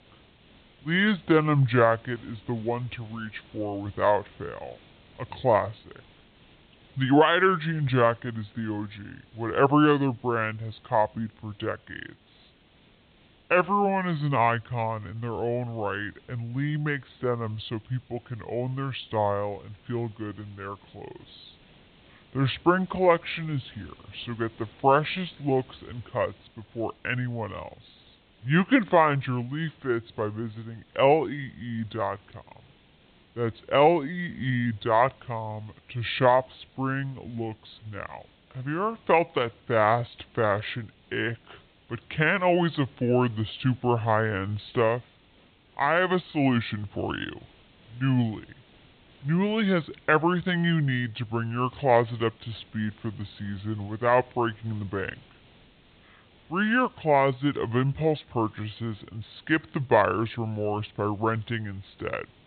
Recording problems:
high frequencies cut off; severe; nothing above 4 kHz
wrong speed and pitch; too slow and too low; 0.7 times normal speed
hiss; faint; throughout; 30 dB below the speech

